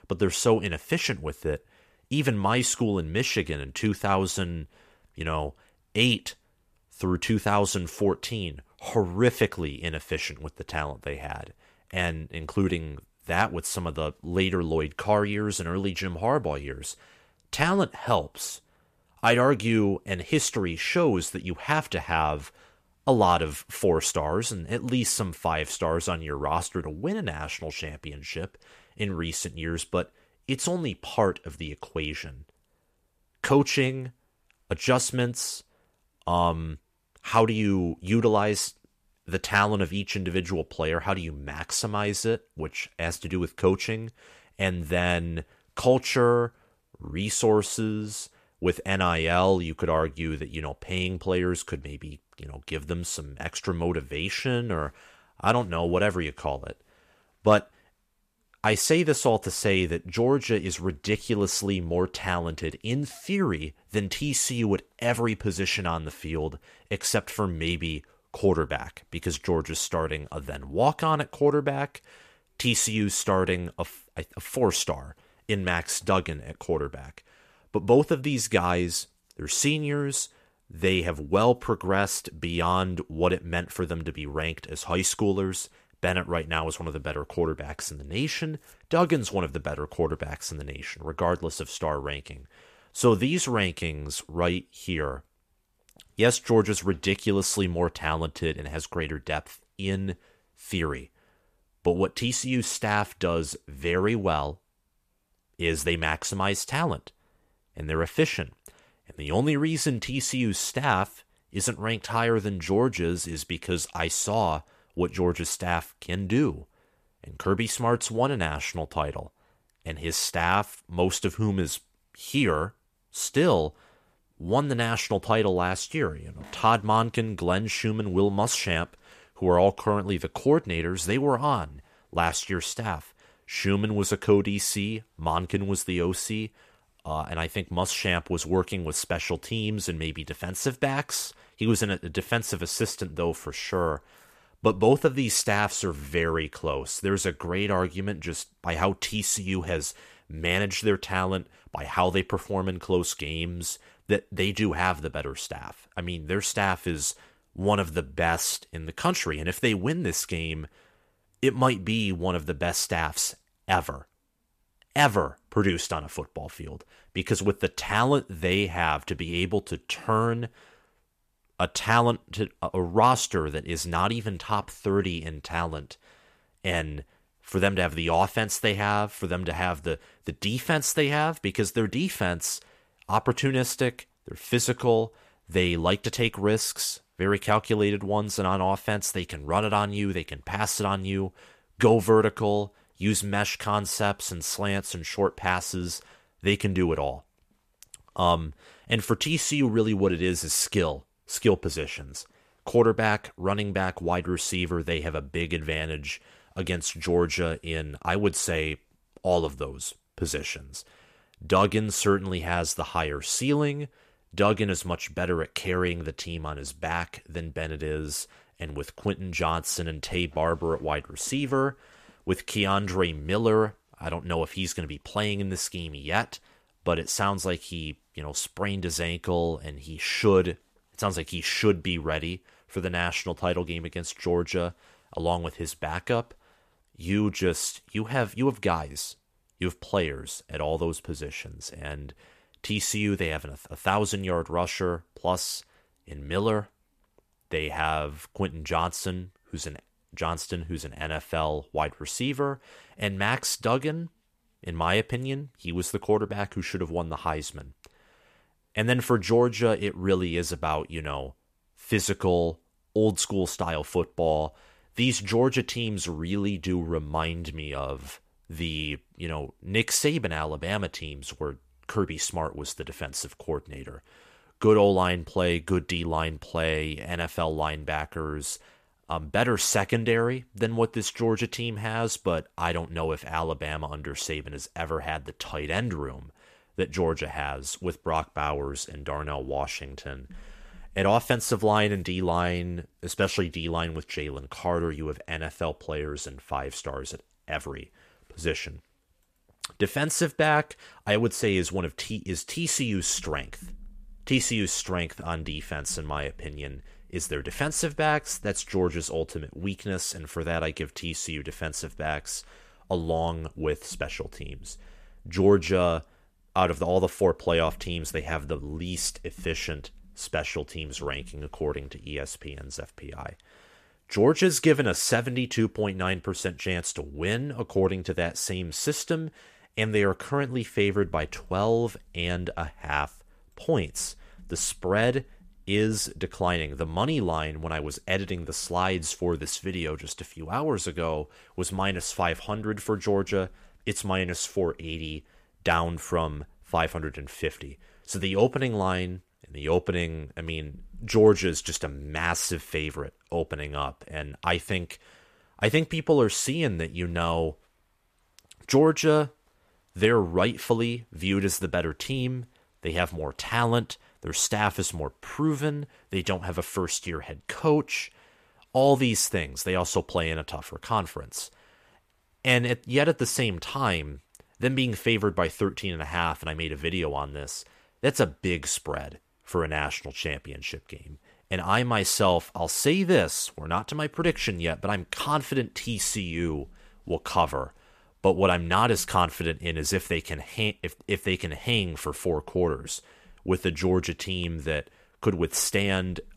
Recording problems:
none

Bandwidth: 14.5 kHz